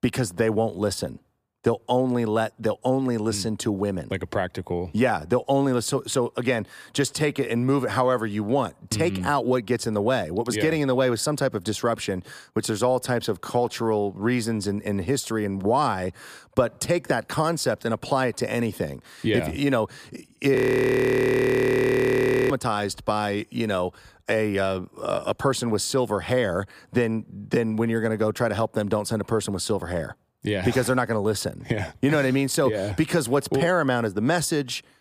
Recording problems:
audio freezing; at 21 s for 2 s

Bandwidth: 15 kHz